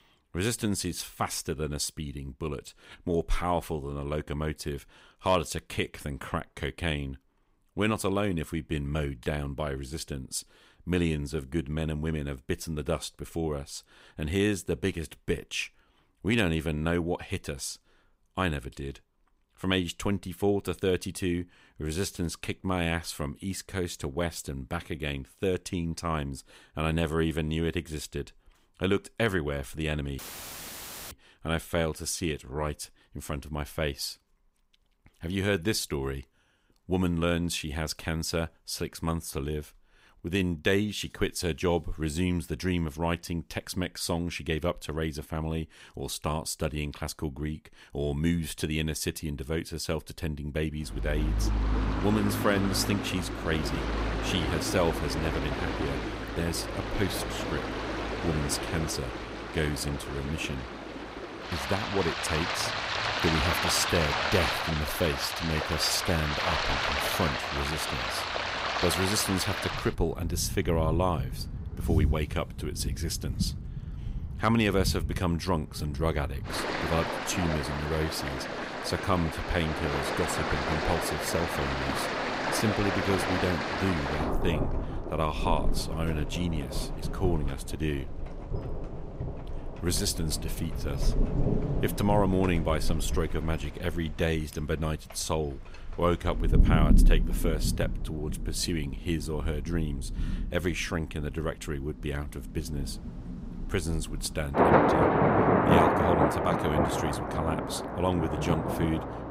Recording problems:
rain or running water; very loud; from 51 s on; as loud as the speech
audio cutting out; filled with static; at 30 s for 1 s

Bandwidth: 15.5 kHz